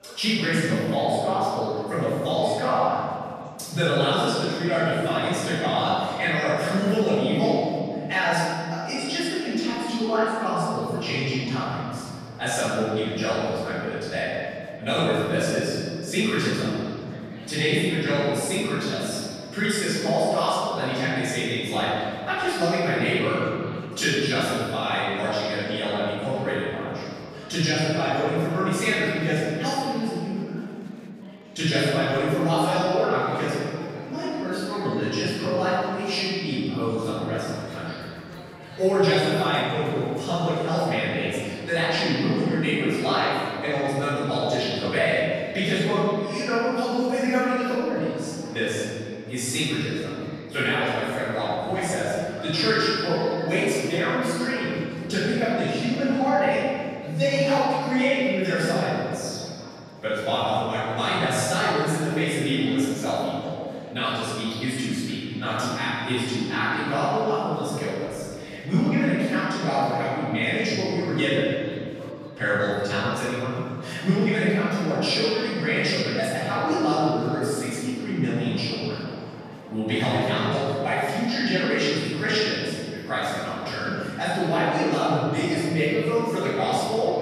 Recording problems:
room echo; strong; dies away in 2.2 s
off-mic speech; far
murmuring crowd; faint; throughout; 20 dB below the speech

